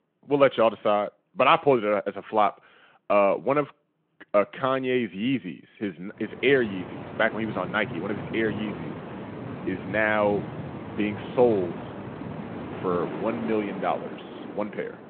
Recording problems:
phone-call audio
wind in the background; noticeable; from 6.5 s on; 10 dB below the speech

